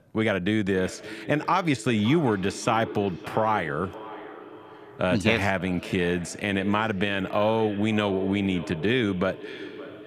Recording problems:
echo of what is said; noticeable; throughout; 570 ms later, 15 dB below the speech

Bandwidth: 14.5 kHz